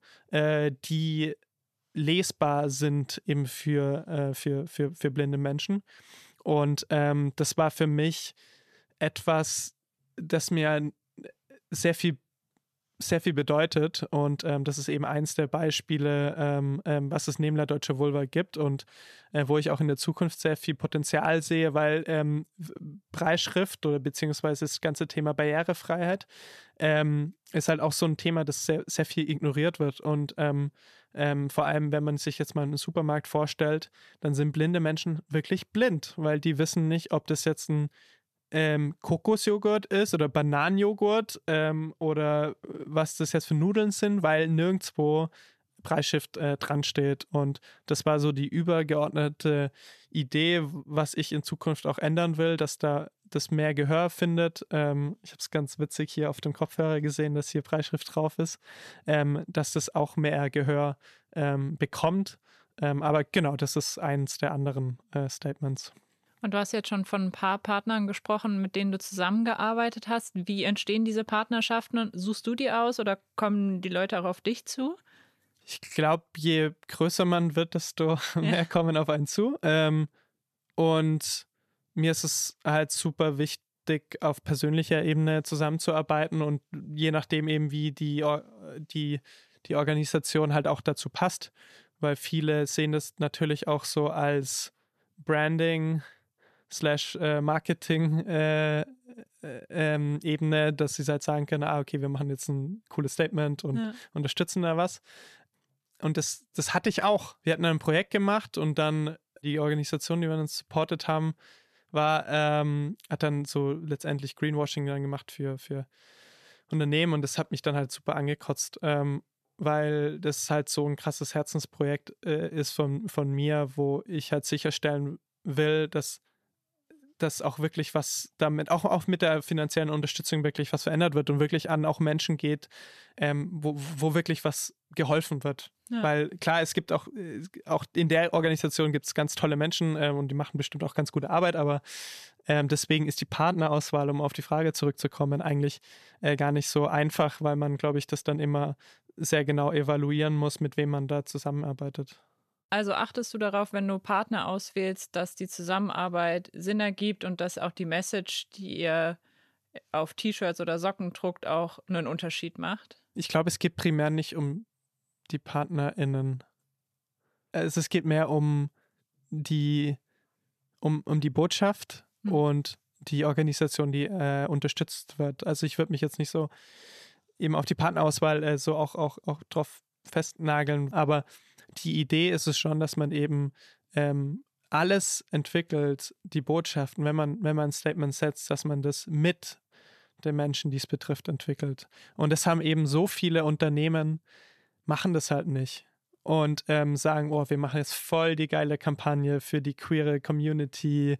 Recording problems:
none

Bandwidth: 14 kHz